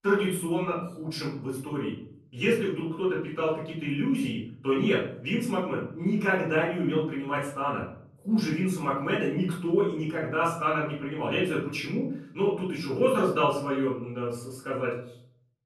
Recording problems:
off-mic speech; far
room echo; noticeable; dies away in 0.6 s

